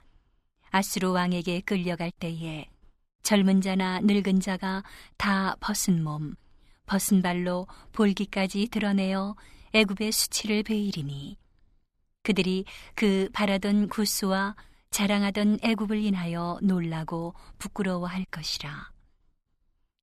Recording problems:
none

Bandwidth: 14 kHz